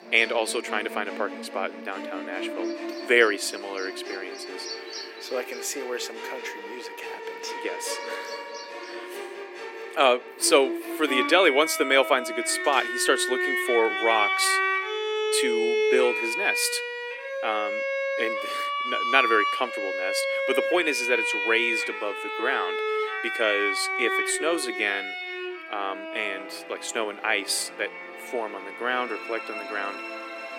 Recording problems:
thin; very; fading below 300 Hz
background music; loud; throughout; 3 dB below the speech
animal sounds; noticeable; until 9 s; 15 dB below the speech

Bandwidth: 16 kHz